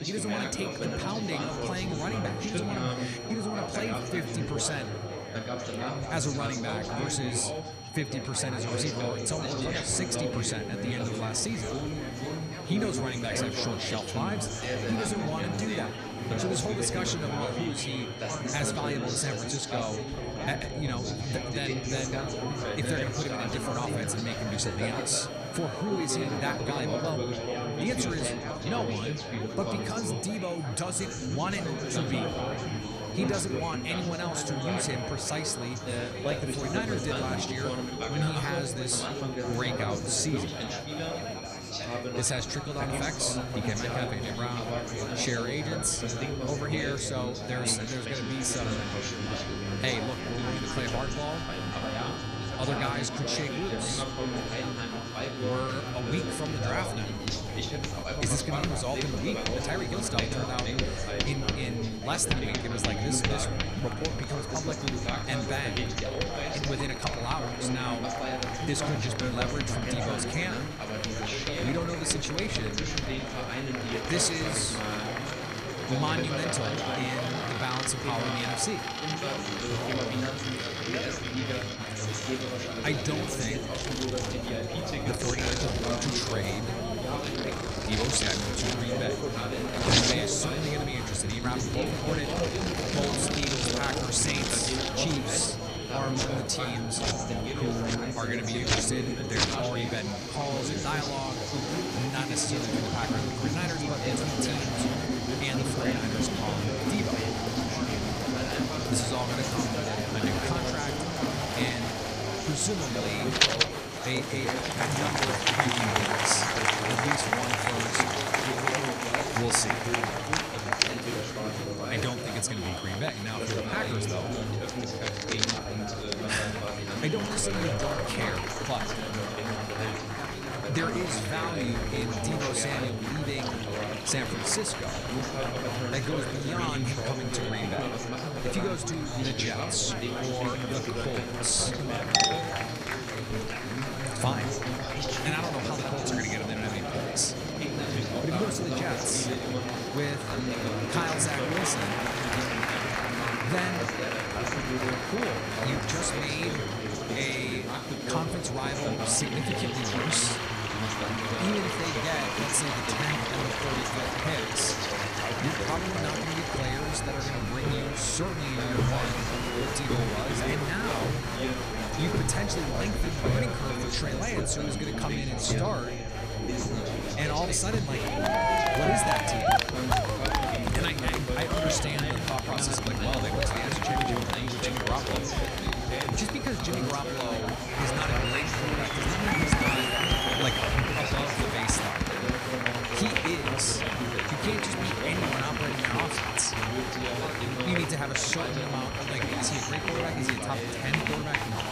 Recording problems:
echo of what is said; noticeable; throughout; 230 ms later, 15 dB below the speech
chatter from many people; very loud; throughout; 1 dB above the speech
household noises; loud; from 48 s on; 3 dB below the speech
high-pitched whine; noticeable; throughout; 4.5 kHz, 15 dB below the speech

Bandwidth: 15 kHz